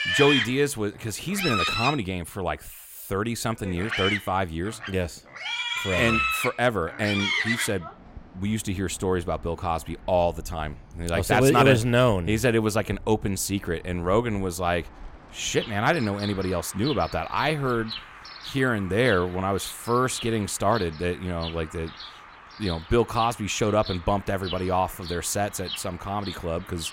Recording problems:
animal sounds; loud; throughout; 5 dB below the speech

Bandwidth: 16 kHz